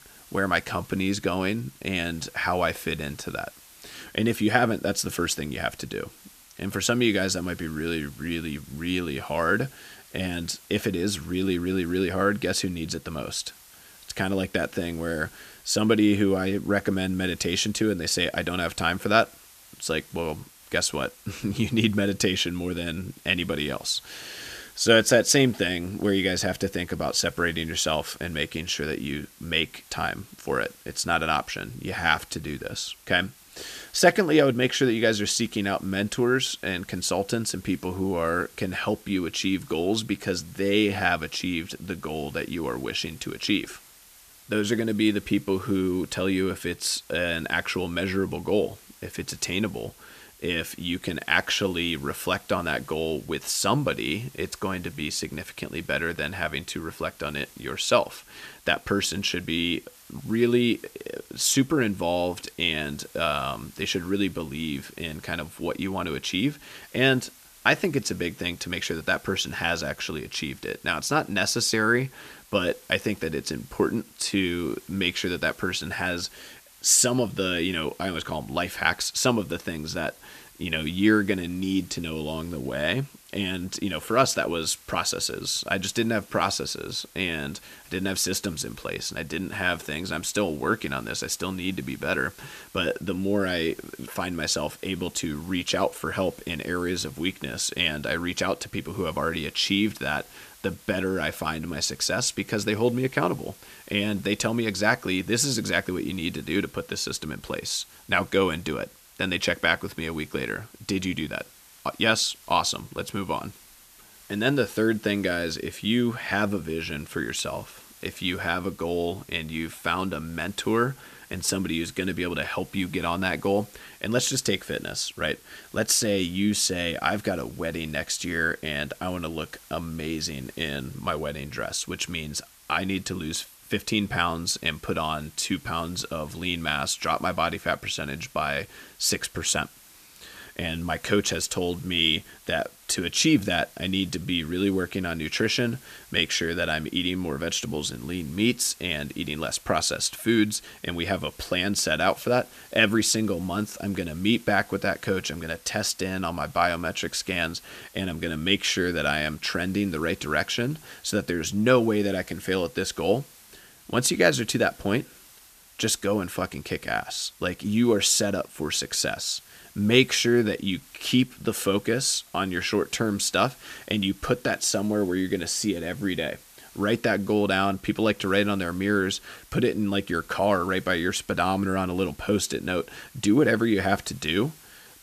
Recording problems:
hiss; faint; throughout; 25 dB below the speech

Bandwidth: 14.5 kHz